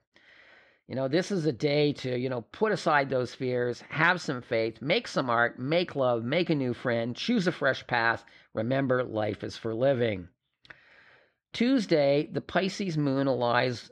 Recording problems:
muffled; very slightly; fading above 3.5 kHz

